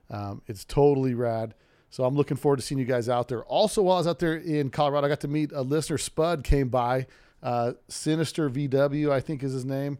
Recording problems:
none

